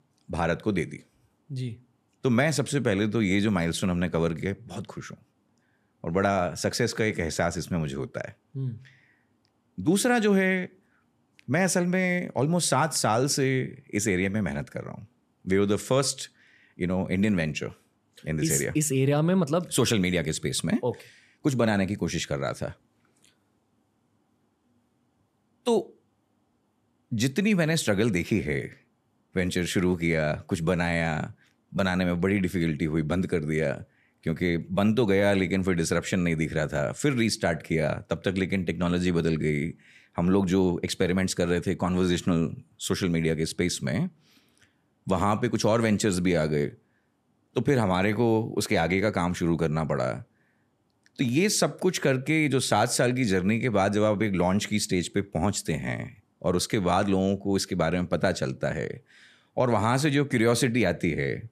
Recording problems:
none

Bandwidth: 14 kHz